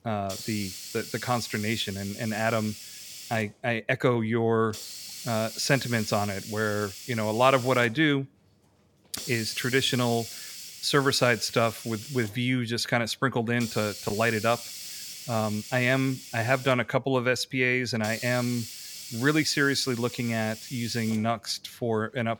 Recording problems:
hiss; noticeable; throughout; 10 dB below the speech

